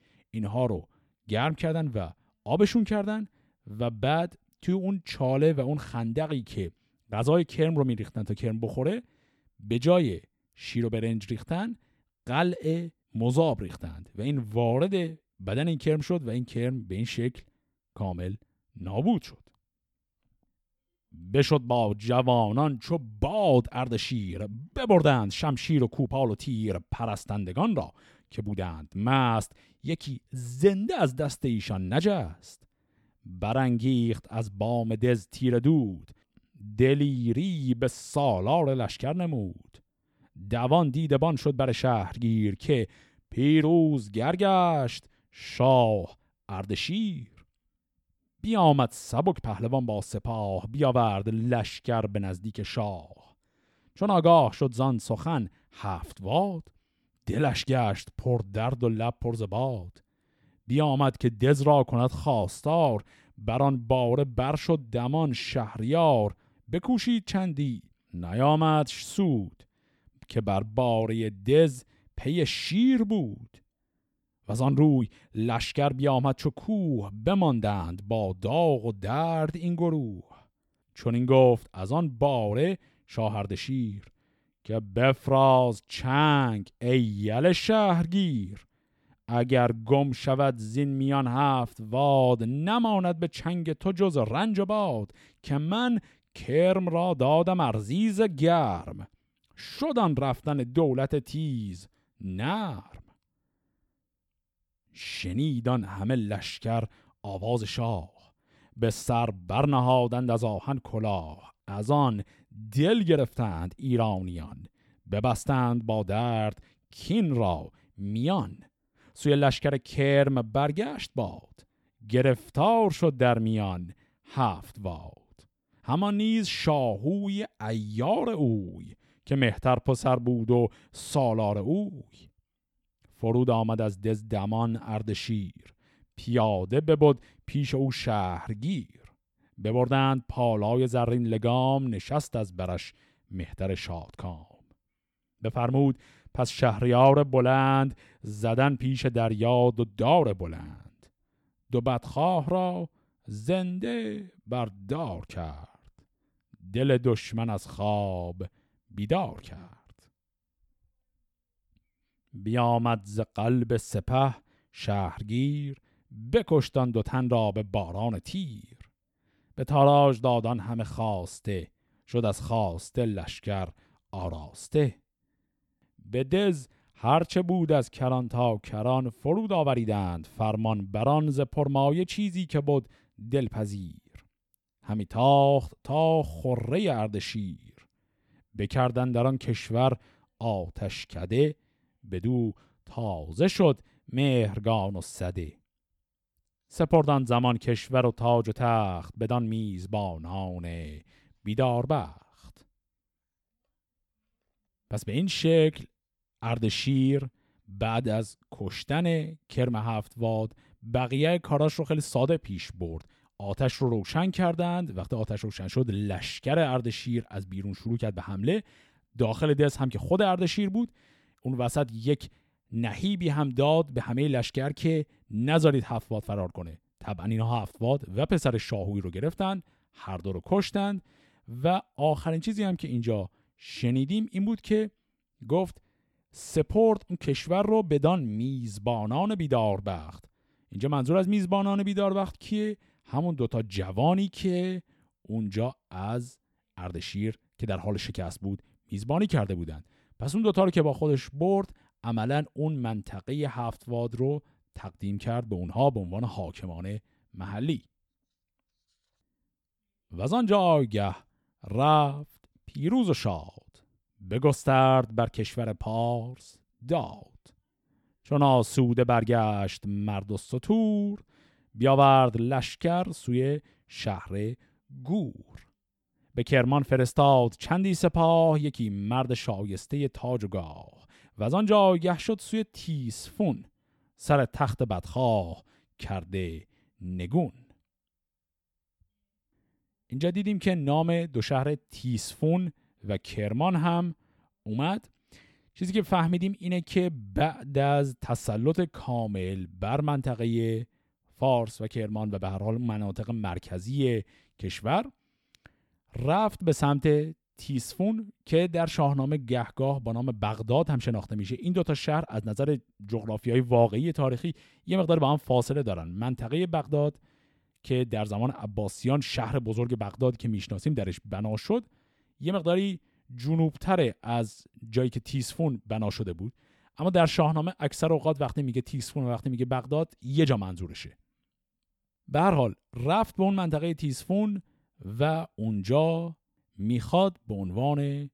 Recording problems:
none

